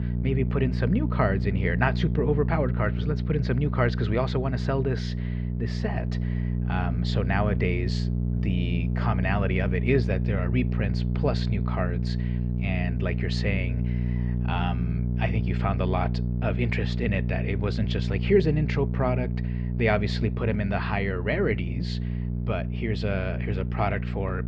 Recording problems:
muffled; slightly; fading above 3 kHz
electrical hum; loud; throughout; 60 Hz, 9 dB below the speech

